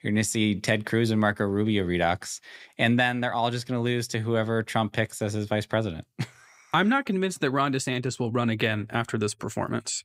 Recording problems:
none

